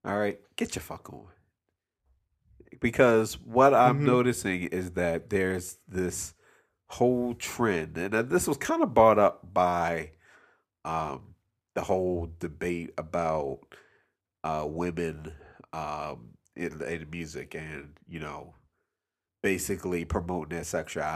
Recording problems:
abrupt cut into speech; at the end

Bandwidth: 14.5 kHz